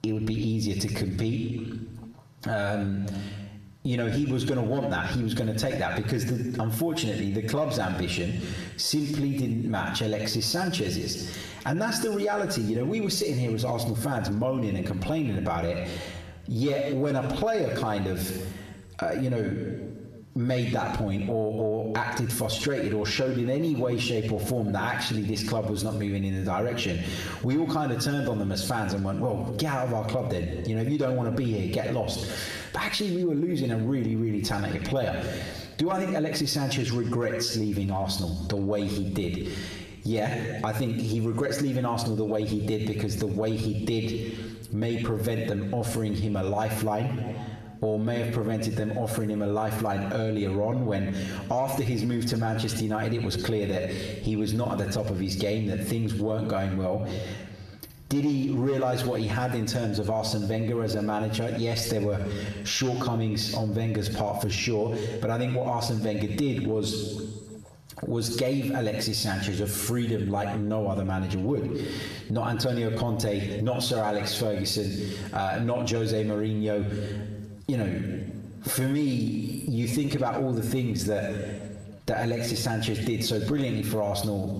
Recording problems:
squashed, flat; heavily
room echo; slight; dies away in 0.8 s
off-mic speech; somewhat distant

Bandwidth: 14.5 kHz